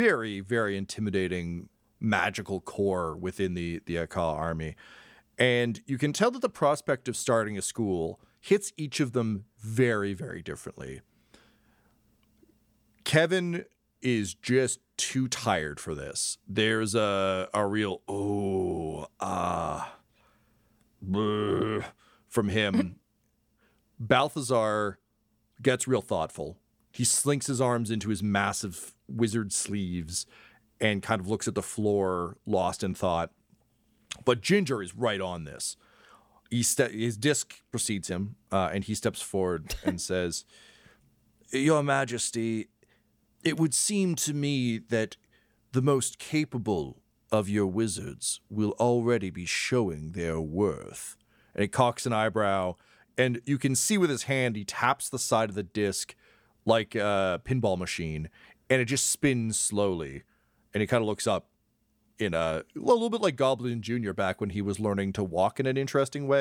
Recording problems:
abrupt cut into speech; at the start and the end

